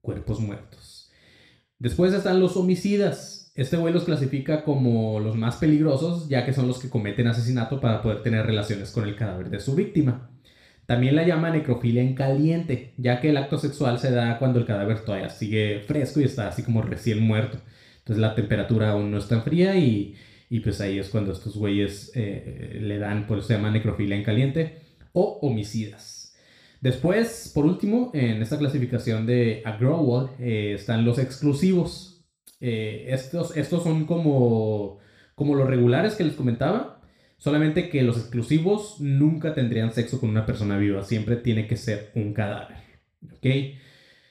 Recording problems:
room echo; slight; dies away in 0.4 s
off-mic speech; somewhat distant

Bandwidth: 15 kHz